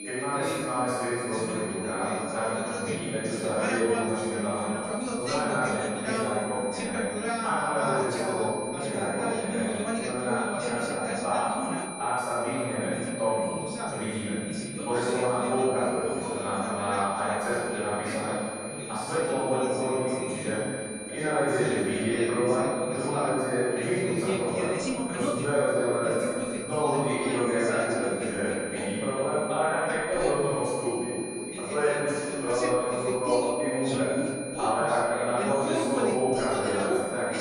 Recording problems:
room echo; strong; dies away in 2.4 s
off-mic speech; far
high-pitched whine; loud; throughout; 9.5 kHz, 10 dB below the speech
background chatter; loud; throughout; 2 voices, 7 dB below the speech

